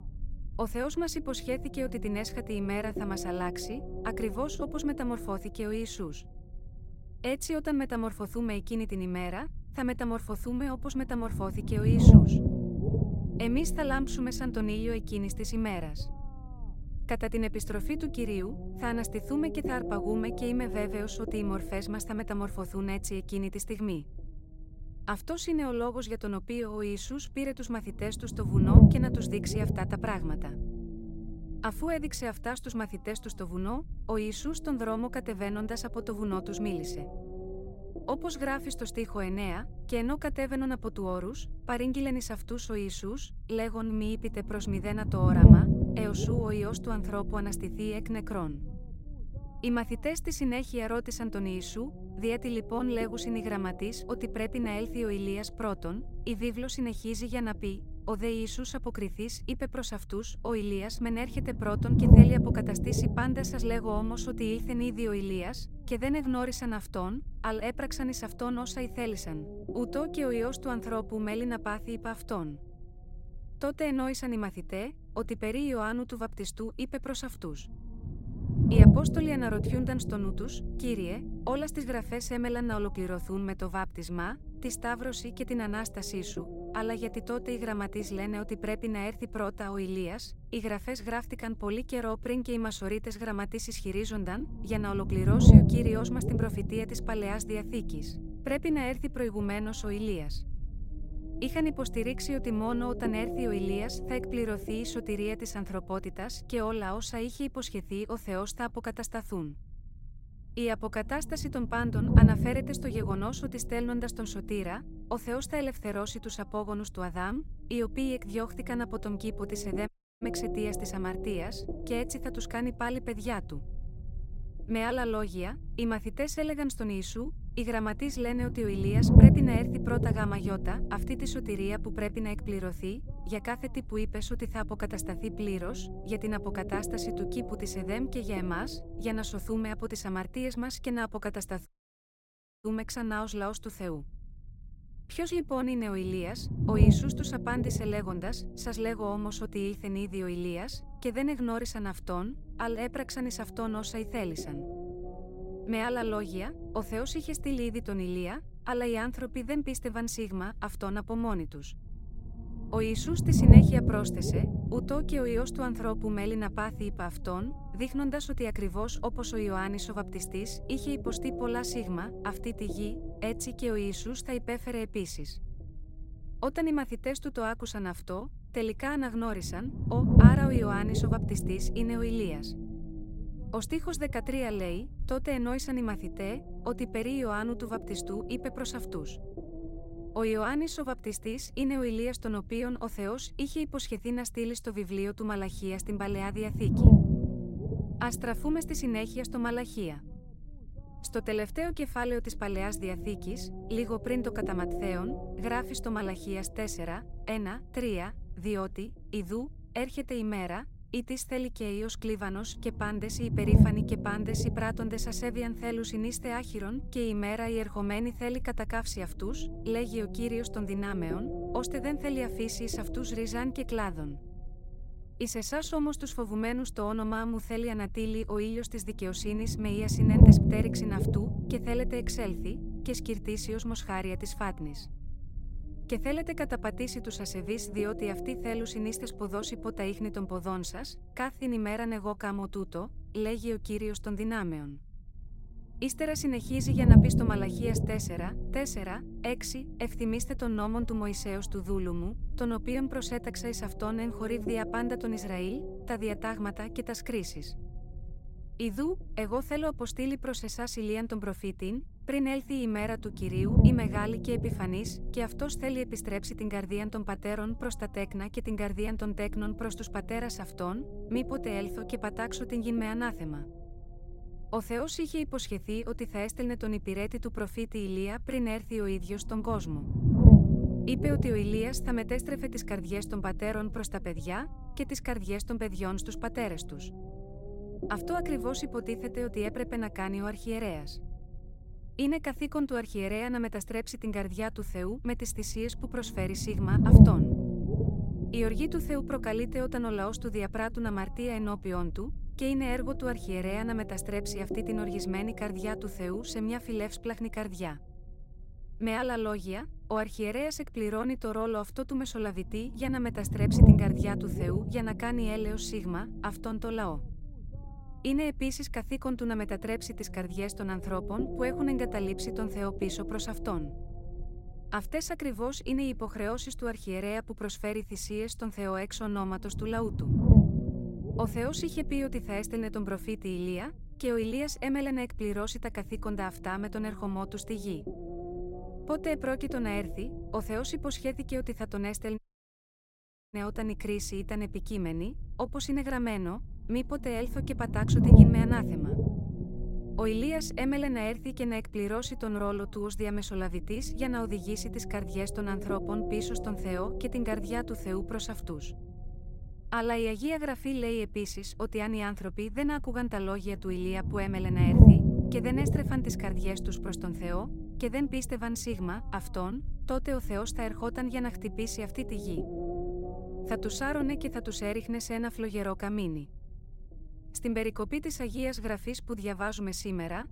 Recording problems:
low rumble; loud; throughout; 3 dB below the speech
audio cutting out; at 2:00, at 2:22 for 1 s and at 5:42 for 1 s

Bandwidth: 16 kHz